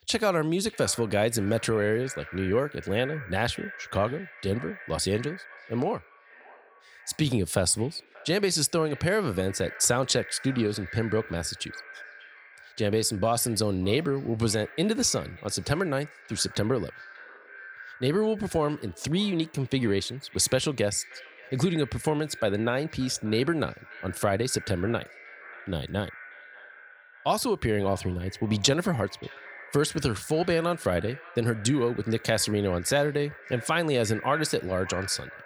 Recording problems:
echo of what is said; noticeable; throughout; 590 ms later, 15 dB below the speech

